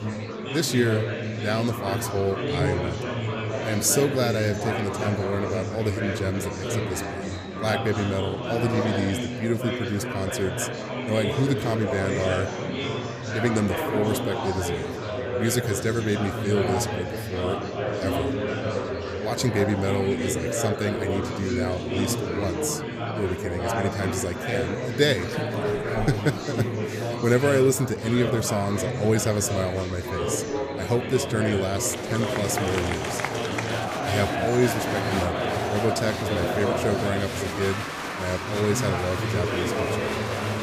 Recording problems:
murmuring crowd; loud; throughout; 1 dB below the speech

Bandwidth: 15 kHz